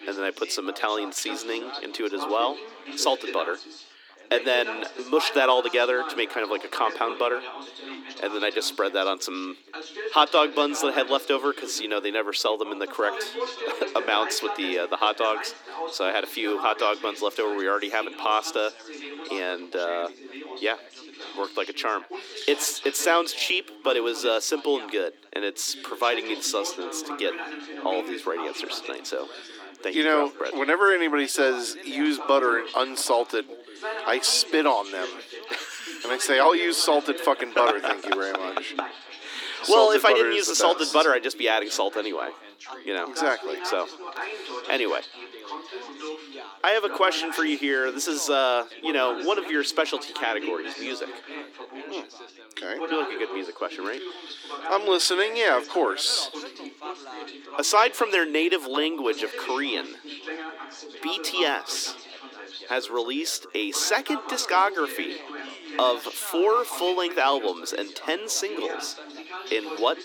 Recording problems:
thin; somewhat; fading below 300 Hz
background chatter; noticeable; throughout; 3 voices, 10 dB below the speech

